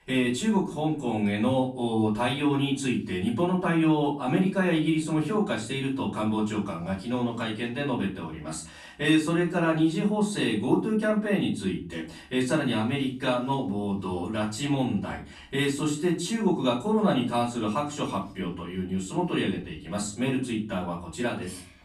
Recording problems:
off-mic speech; far
room echo; slight; dies away in 0.4 s

